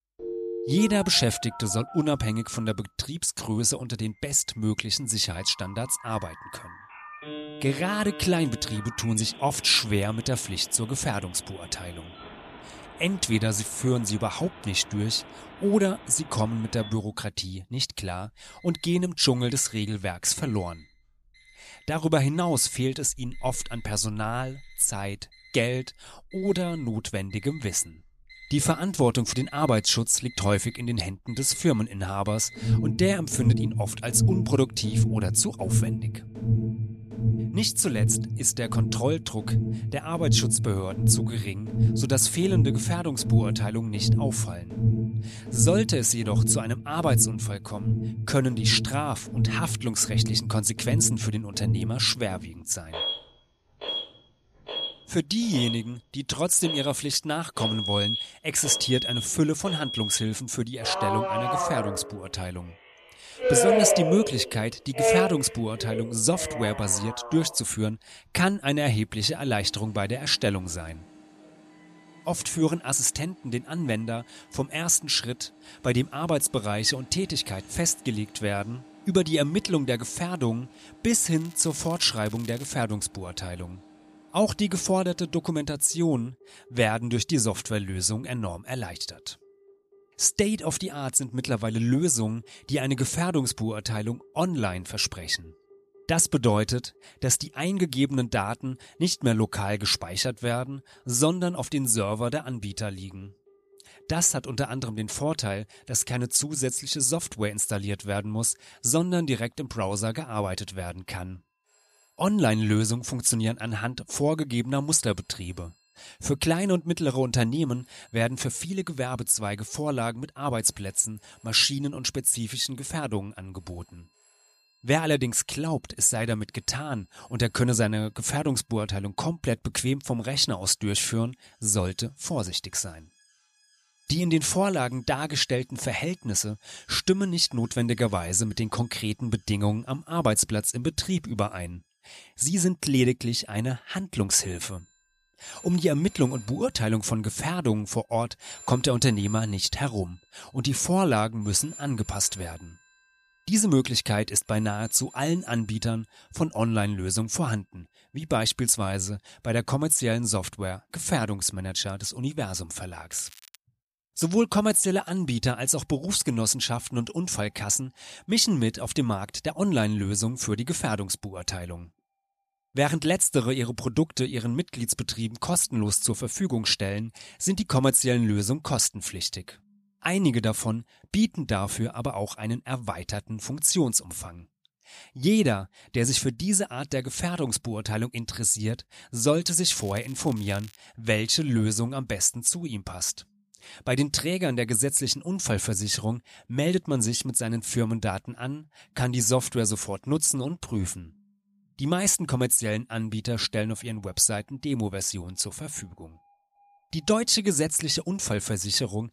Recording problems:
alarms or sirens; loud; throughout; 4 dB below the speech
crackling; faint; from 1:21 to 1:23, at 2:43 and from 3:10 to 3:11; 20 dB below the speech

